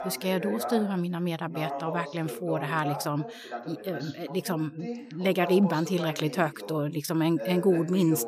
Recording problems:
voice in the background; loud; throughout; 9 dB below the speech

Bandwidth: 15 kHz